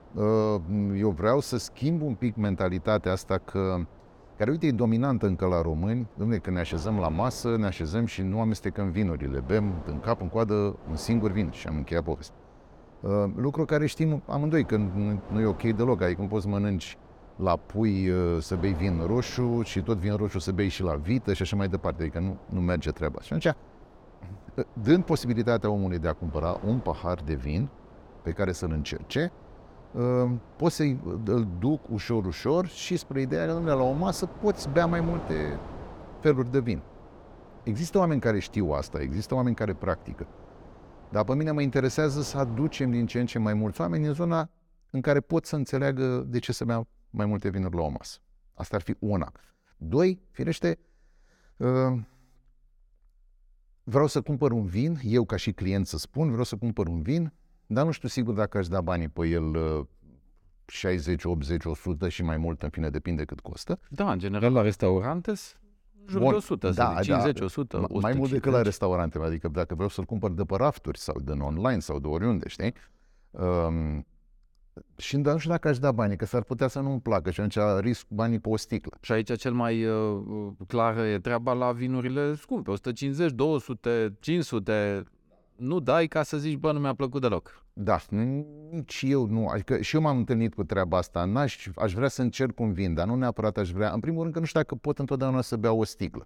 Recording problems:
wind noise on the microphone; occasional gusts; until 44 s; 20 dB below the speech

